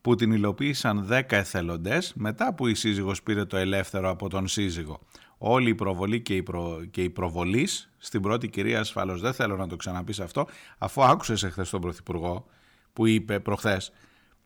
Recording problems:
none

